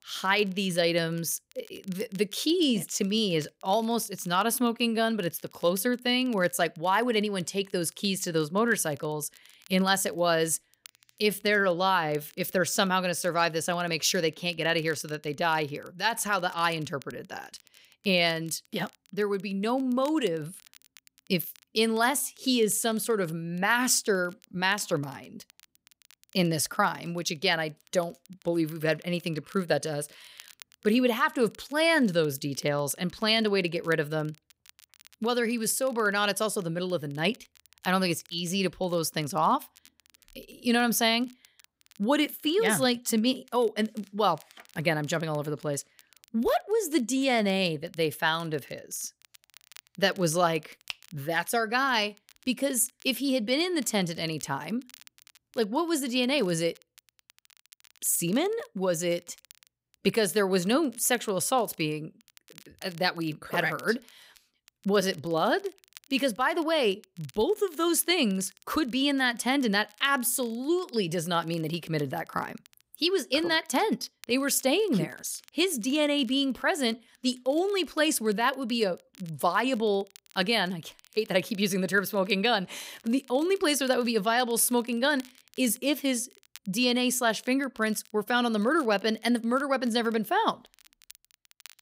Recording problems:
crackle, like an old record; faint; 30 dB below the speech

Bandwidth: 15.5 kHz